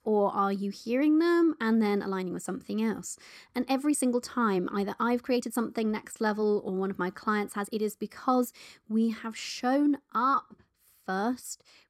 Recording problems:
uneven, jittery; strongly; from 1 to 11 s

